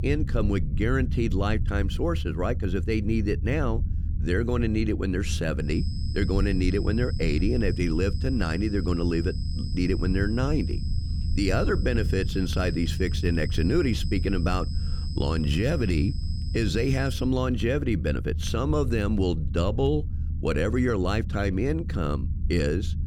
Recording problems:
high-pitched whine; noticeable; from 5.5 to 17 s; 5 kHz, 15 dB below the speech
low rumble; noticeable; throughout; 15 dB below the speech

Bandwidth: 19 kHz